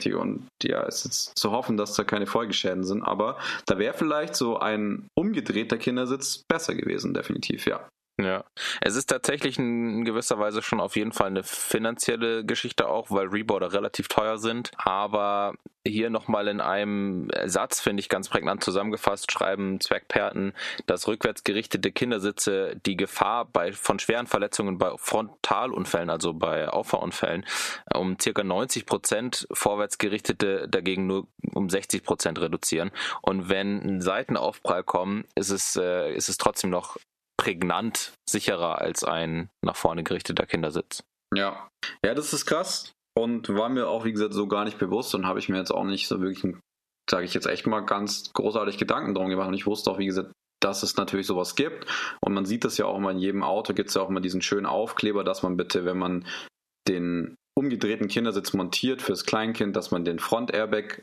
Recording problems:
squashed, flat; heavily

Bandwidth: 13.5 kHz